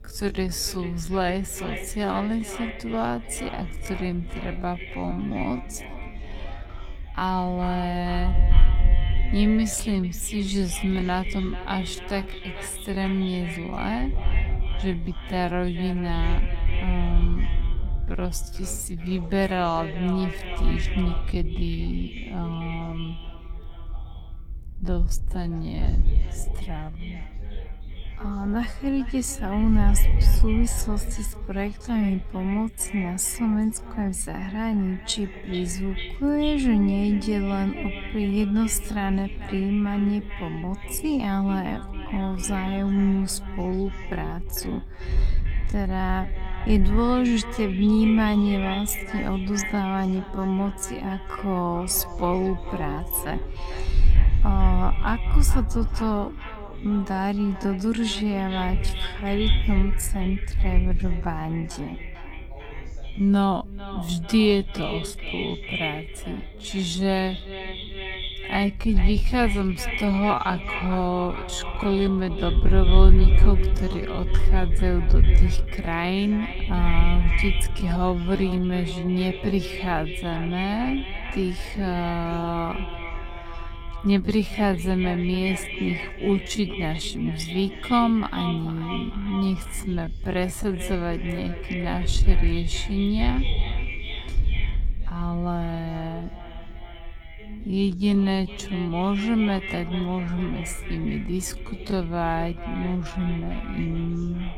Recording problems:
echo of what is said; strong; throughout; 440 ms later, 10 dB below the speech
wrong speed, natural pitch; too slow; 0.5 times normal speed
wind noise on the microphone; occasional gusts; 20 dB below the speech
voice in the background; faint; throughout; 25 dB below the speech

